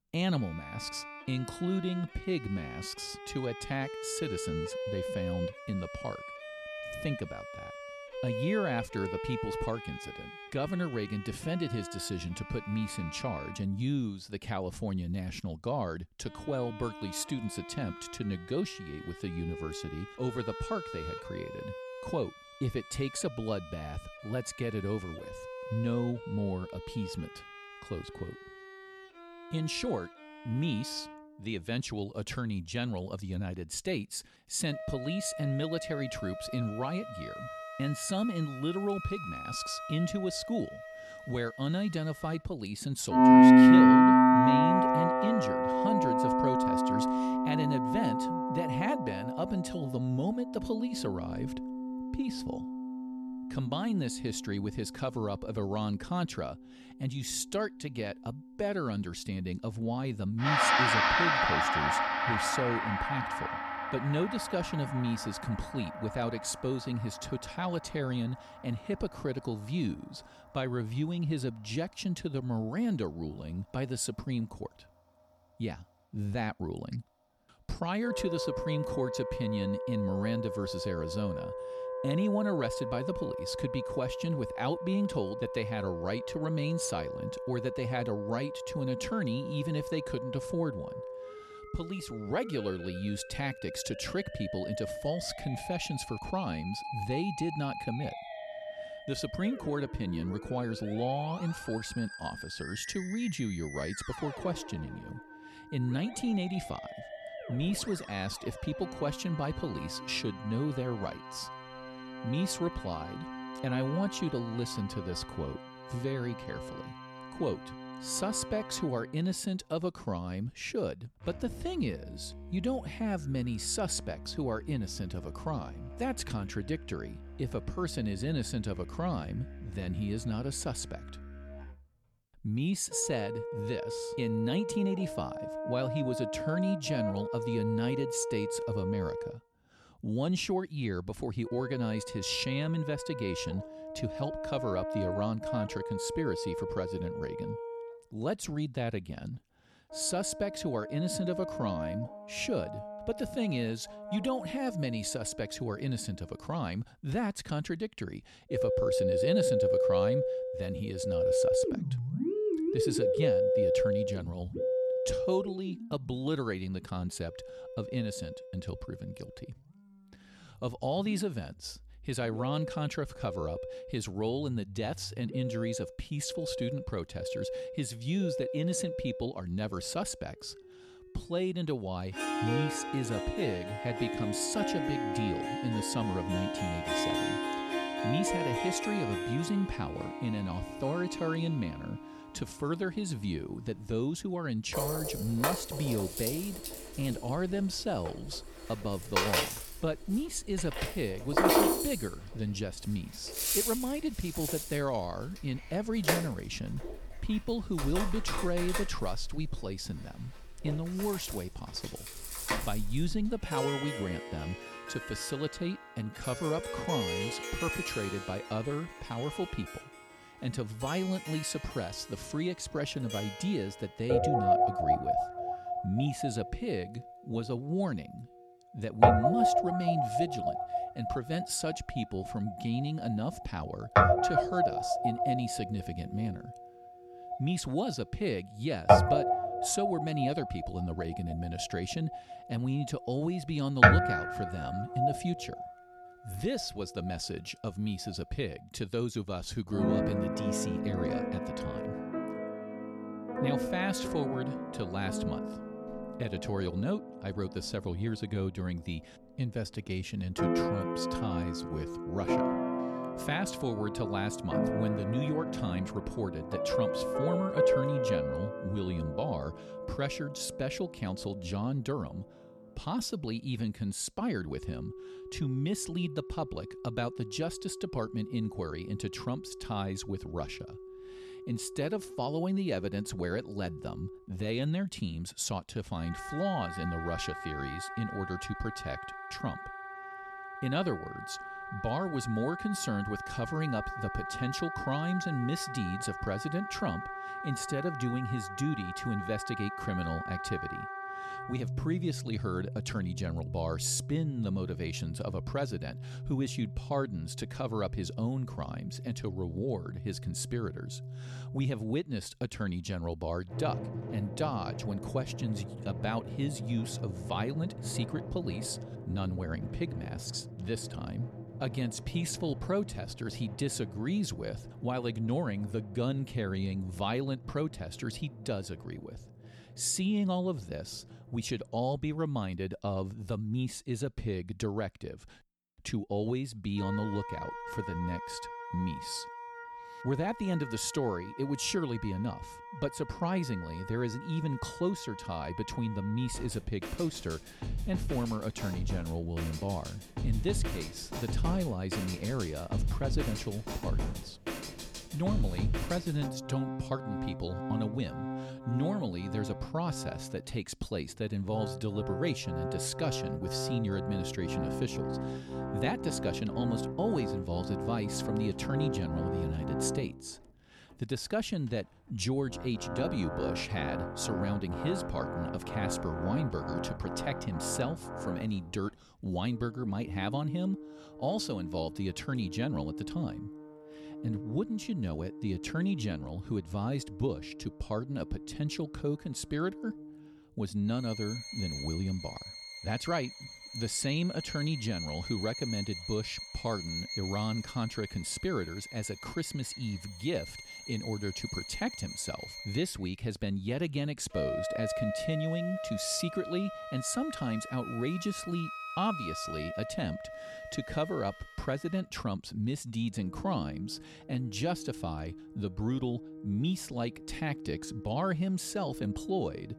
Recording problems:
background music; very loud; throughout; 1 dB above the speech

